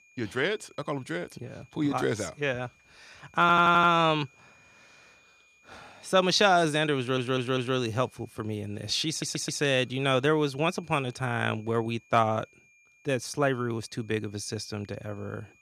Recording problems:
high-pitched whine; faint; throughout; 2.5 kHz, 30 dB below the speech
audio stuttering; at 3.5 s, at 7 s and at 9 s

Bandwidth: 15 kHz